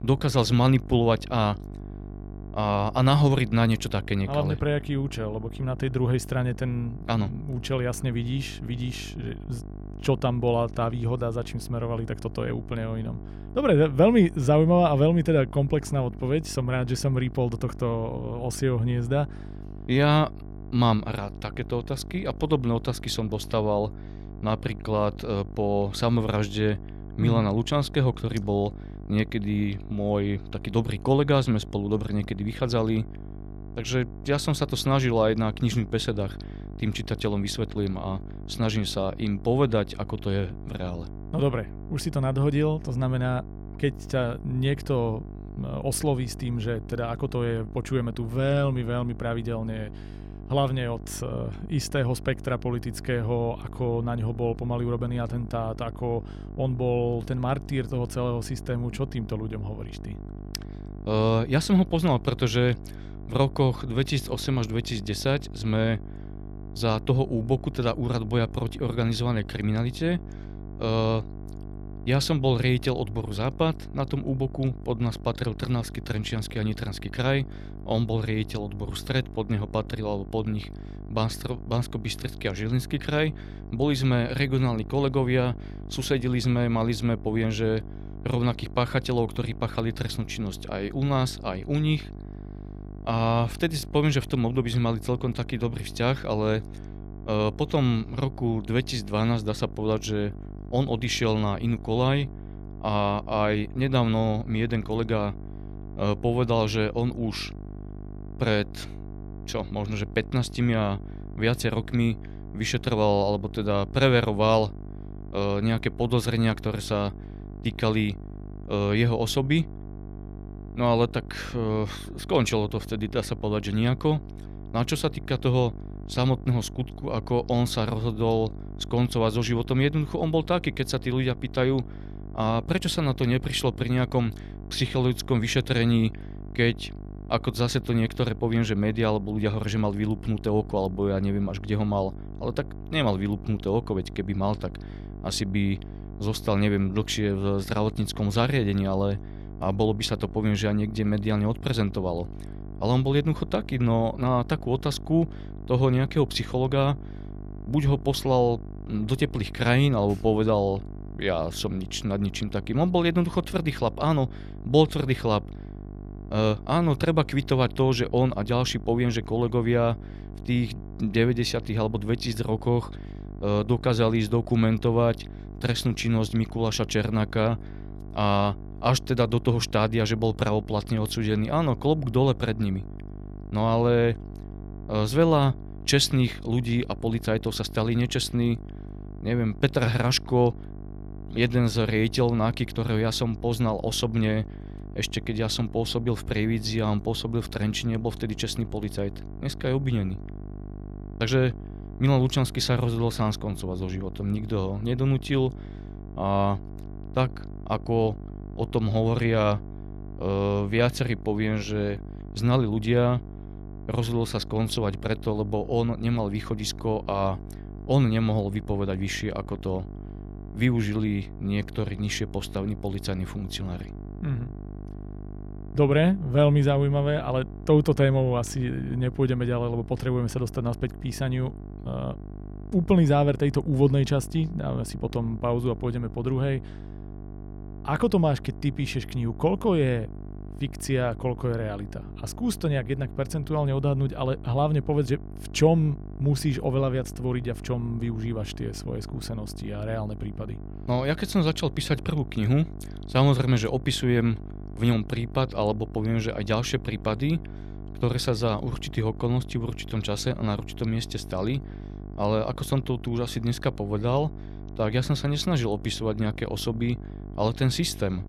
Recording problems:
electrical hum; noticeable; throughout; 50 Hz, 20 dB below the speech

